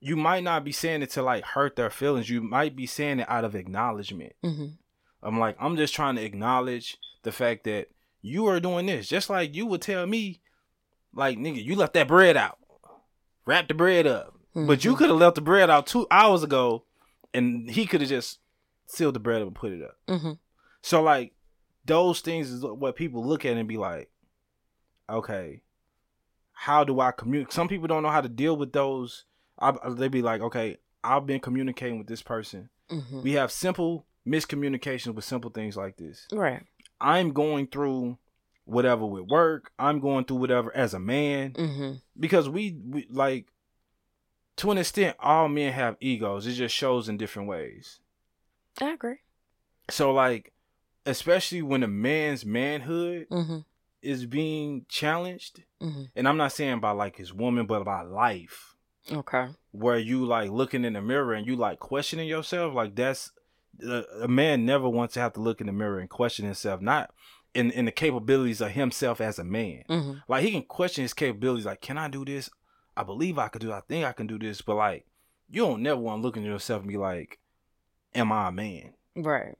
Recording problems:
none

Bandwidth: 16.5 kHz